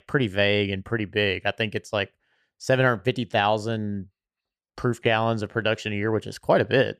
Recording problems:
none

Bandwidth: 14.5 kHz